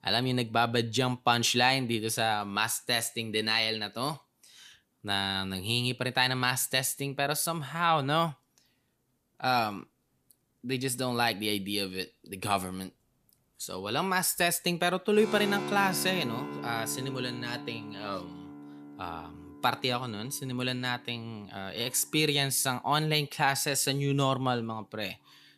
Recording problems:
background music; noticeable; throughout; 10 dB below the speech

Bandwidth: 14.5 kHz